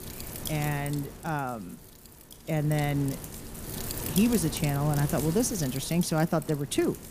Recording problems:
wind noise on the microphone; heavy; 9 dB below the speech

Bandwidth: 15 kHz